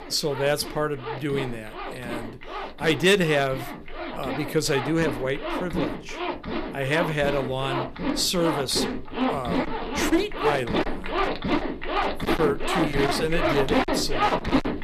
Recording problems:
distortion; slight; 5% of the sound clipped
household noises; loud; throughout; 3 dB below the speech

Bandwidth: 15 kHz